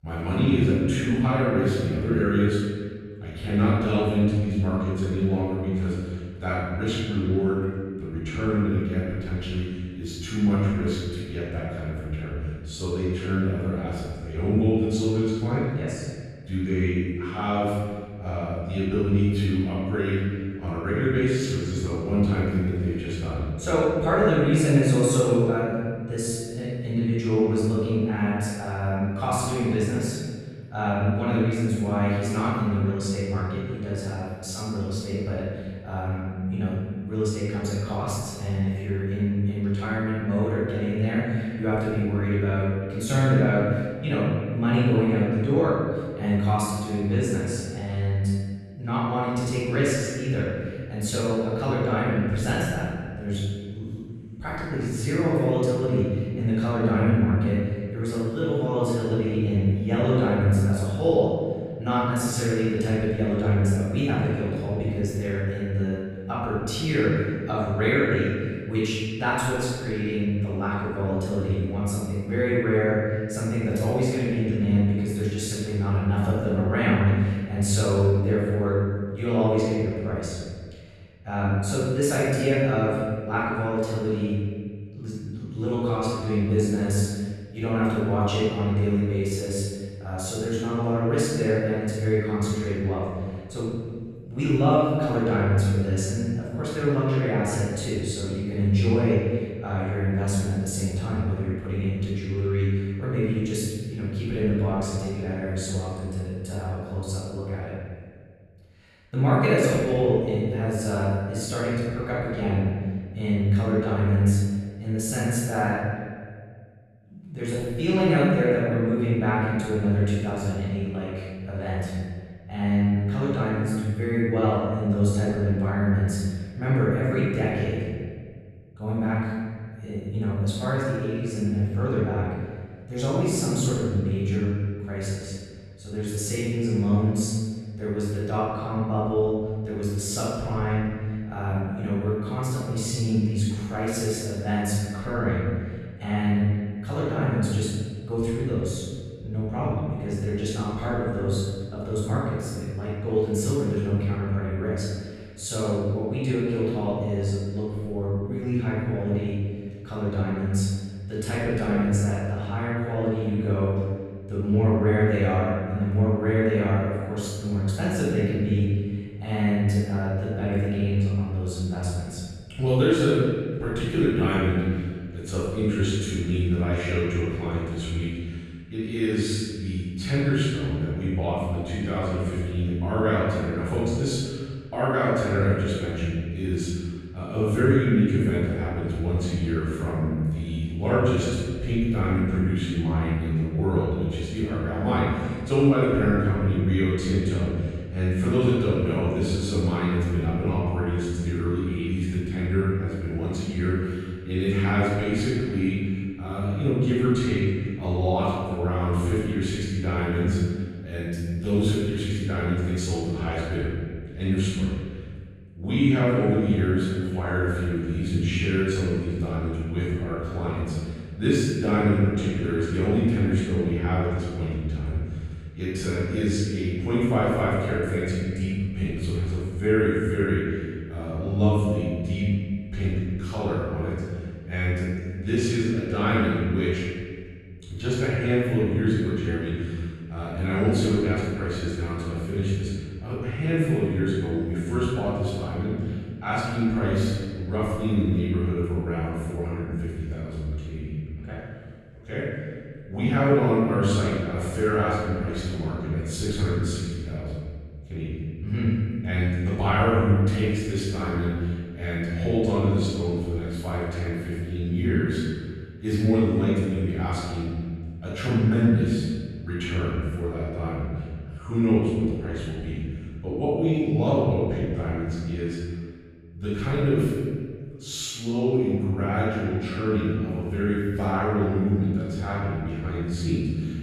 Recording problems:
room echo; strong; dies away in 1.8 s
off-mic speech; far

